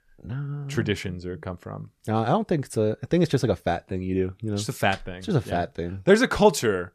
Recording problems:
none

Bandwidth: 14 kHz